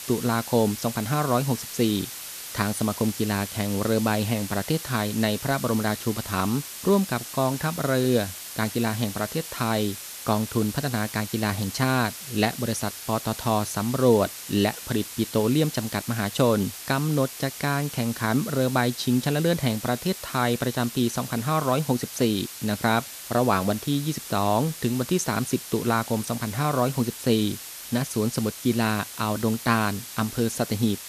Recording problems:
hiss; loud; throughout; 10 dB below the speech

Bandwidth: 14.5 kHz